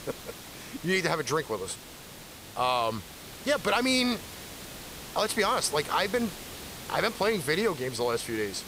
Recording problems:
hiss; noticeable; throughout; 15 dB below the speech

